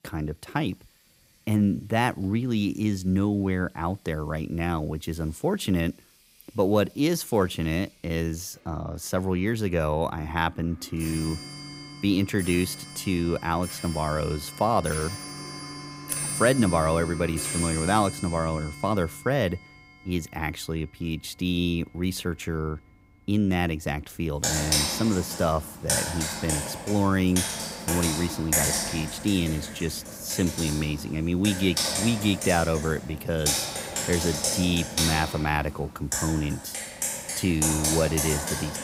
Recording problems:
household noises; loud; throughout; 3 dB below the speech

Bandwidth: 15.5 kHz